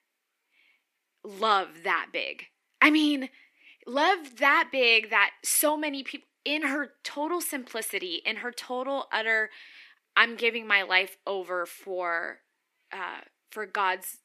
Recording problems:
thin; very slightly; fading below 300 Hz

